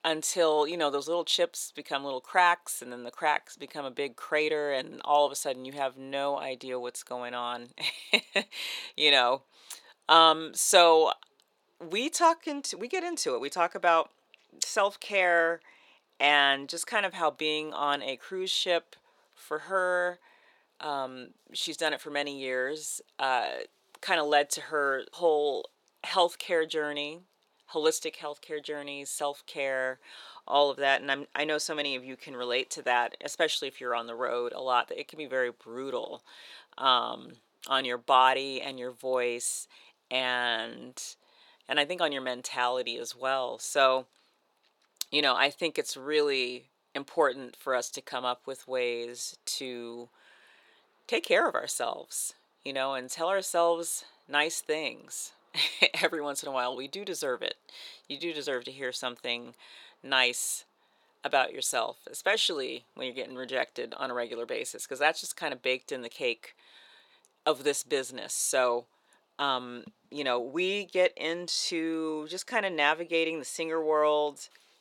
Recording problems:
thin; somewhat; fading below 500 Hz

